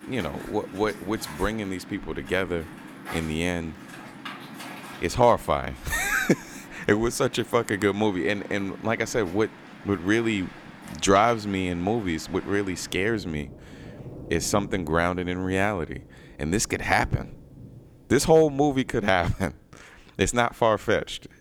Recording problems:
rain or running water; noticeable; throughout; 15 dB below the speech

